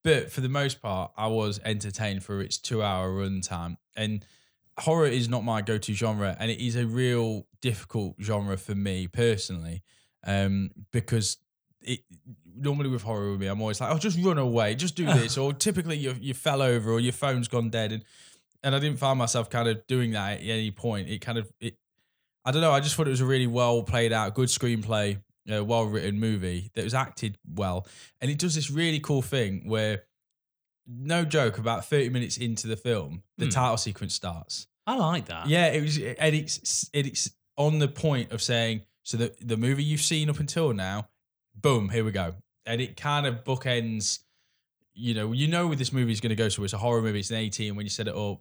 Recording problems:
uneven, jittery; strongly; from 2.5 to 44 s

